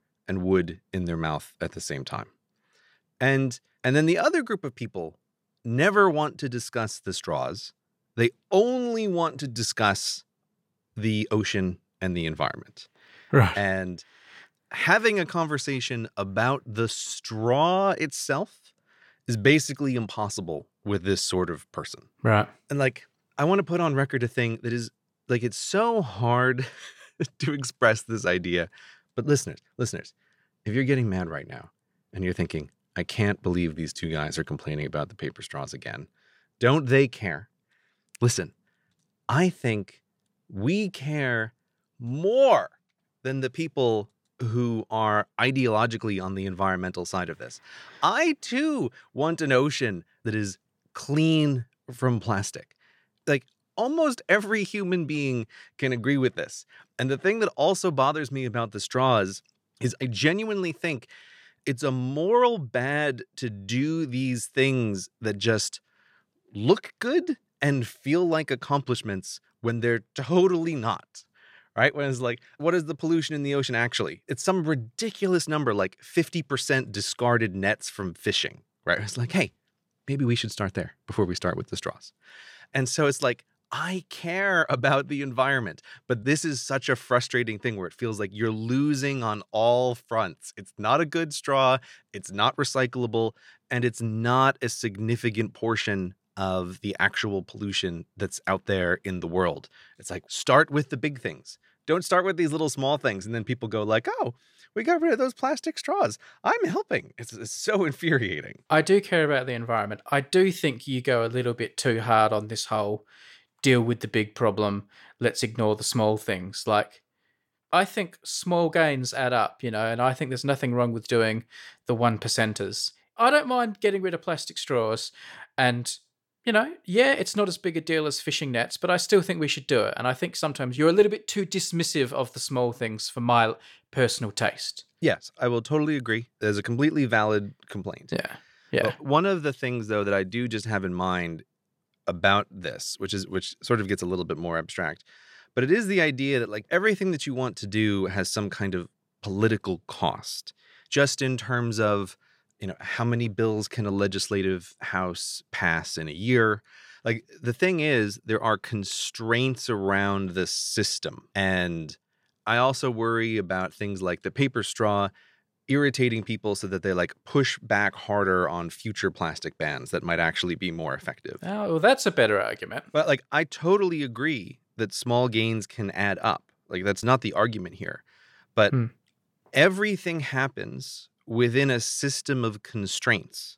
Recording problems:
none

